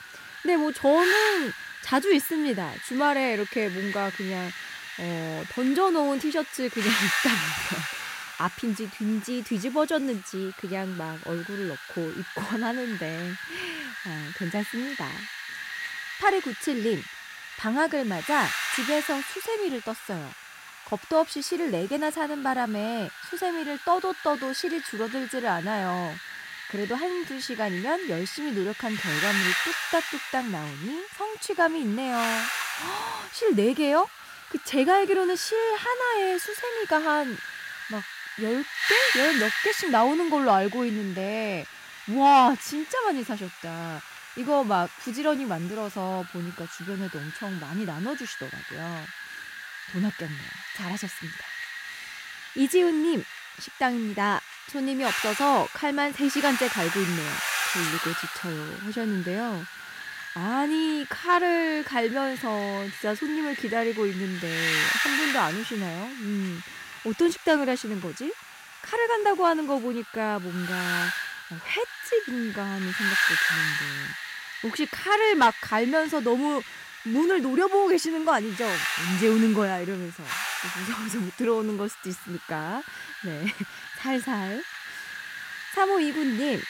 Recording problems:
wind noise on the microphone; heavy; 4 dB below the speech

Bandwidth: 16 kHz